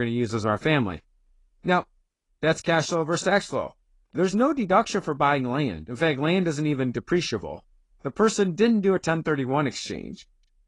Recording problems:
garbled, watery; slightly
abrupt cut into speech; at the start

